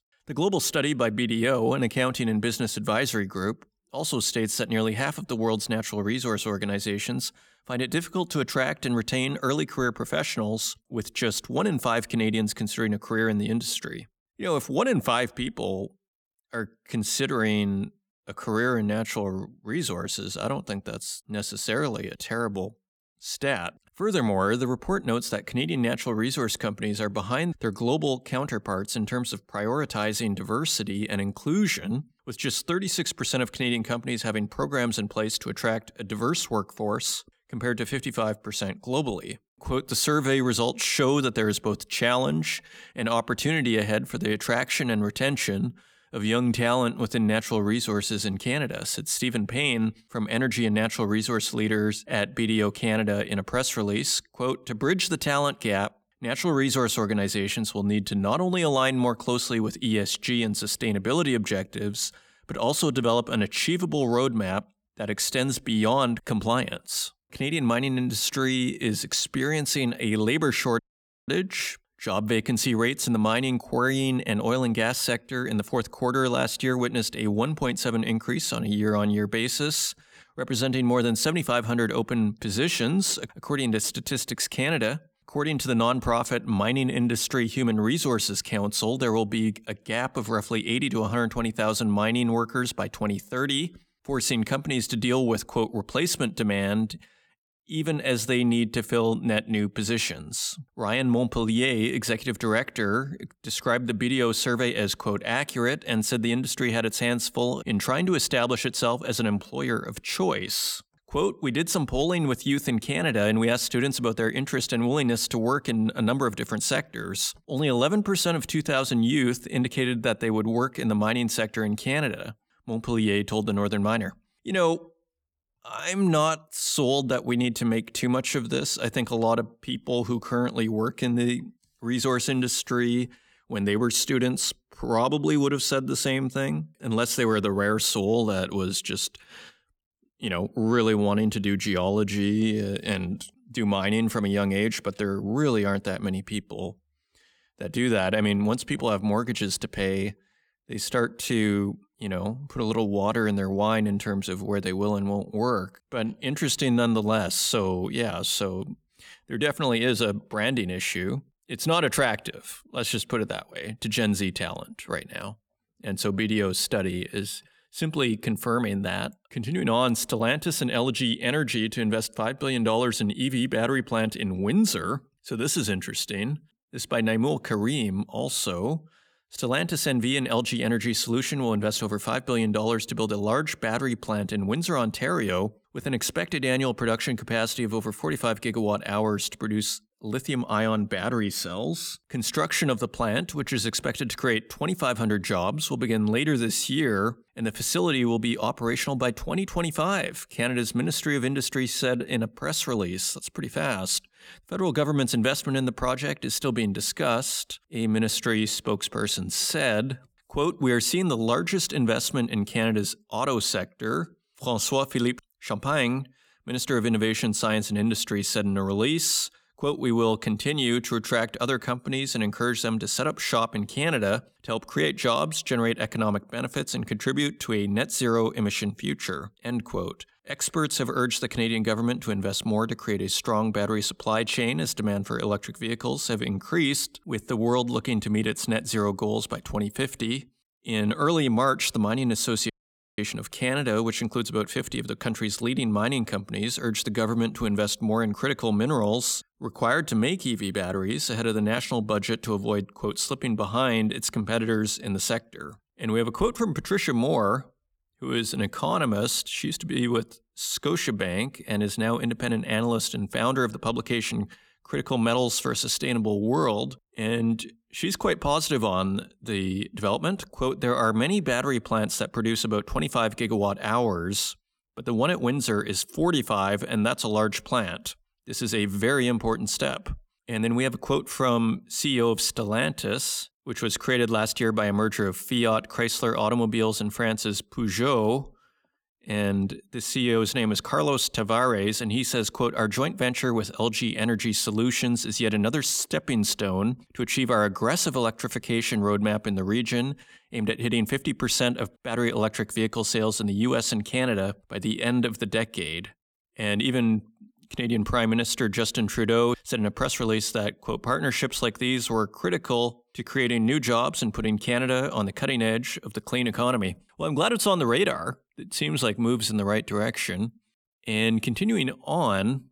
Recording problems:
audio cutting out; at 1:11 and at 4:03

